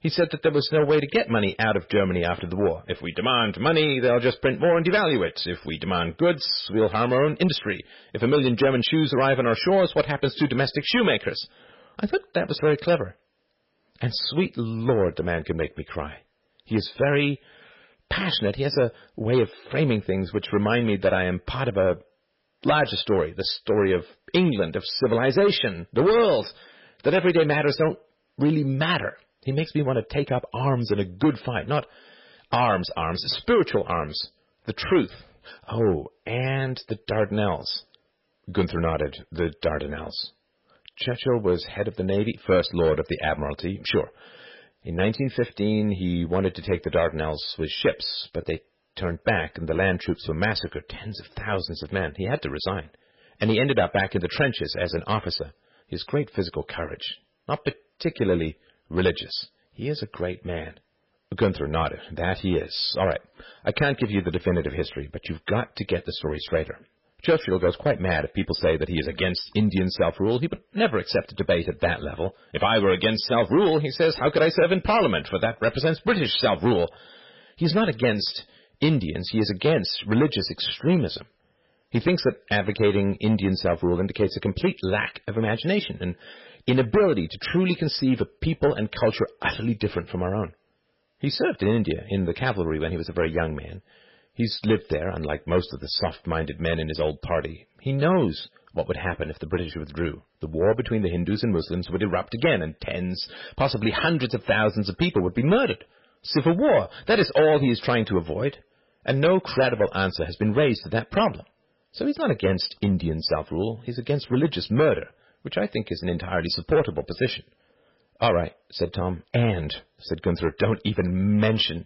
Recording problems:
garbled, watery; badly; nothing above 5.5 kHz
distortion; slight; 3% of the sound clipped

